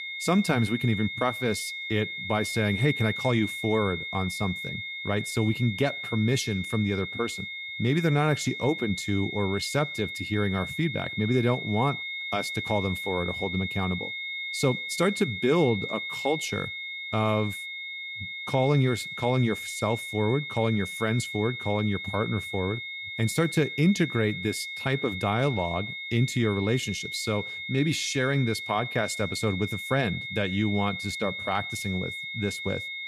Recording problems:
high-pitched whine; loud; throughout; 2 kHz, 5 dB below the speech

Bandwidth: 14.5 kHz